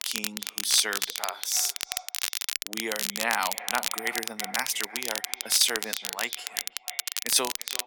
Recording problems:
echo of what is said; noticeable; throughout; 330 ms later, 15 dB below the speech
thin; somewhat; fading below 300 Hz
crackle, like an old record; loud; 3 dB below the speech

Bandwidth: 17.5 kHz